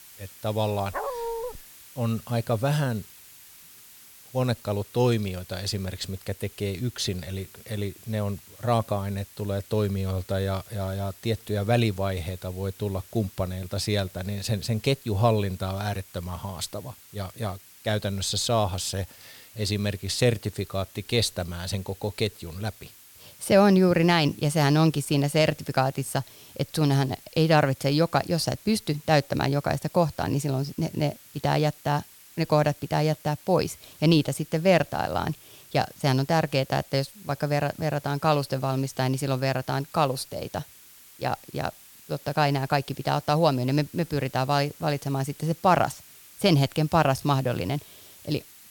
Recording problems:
hiss; faint; throughout; 20 dB below the speech
dog barking; noticeable; at 1 s; peak 5 dB below the speech

